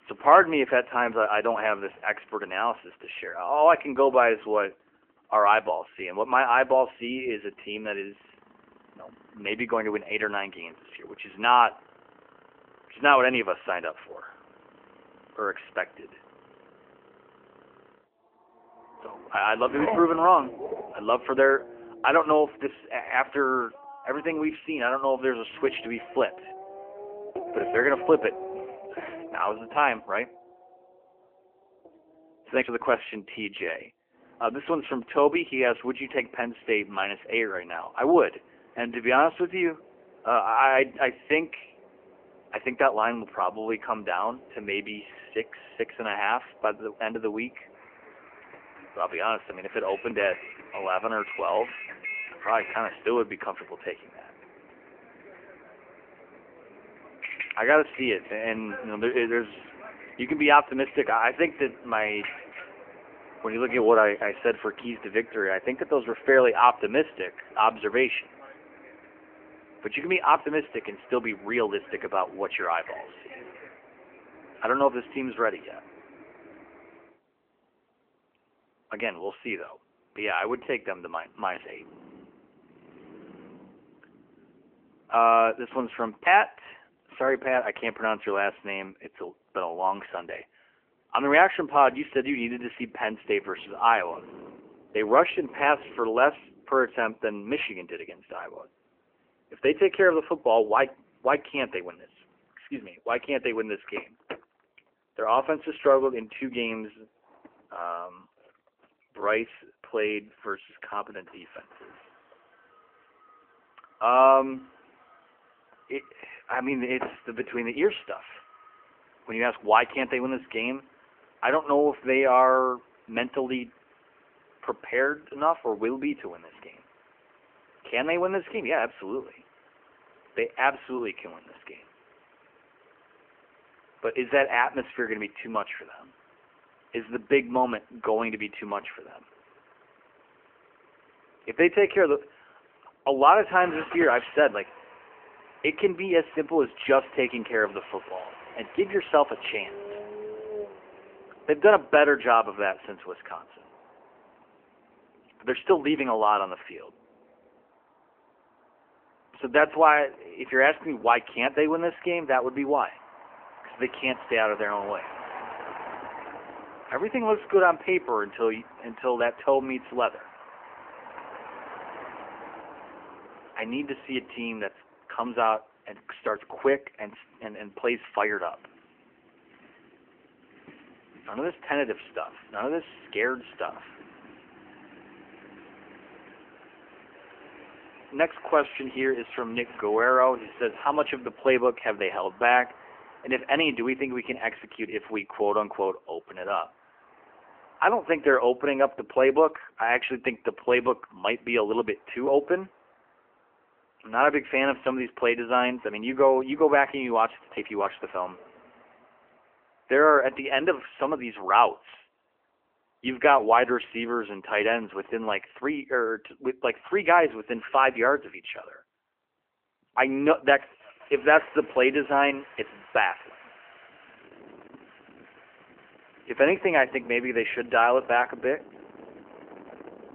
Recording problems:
phone-call audio; nothing above 3 kHz
traffic noise; noticeable; throughout; 20 dB below the speech

